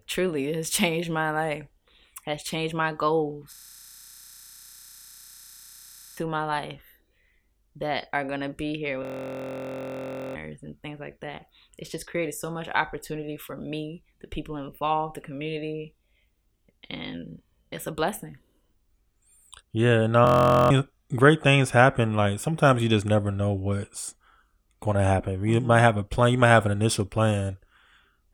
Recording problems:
audio freezing; at 3.5 s for 2.5 s, at 9 s for 1.5 s and at 20 s

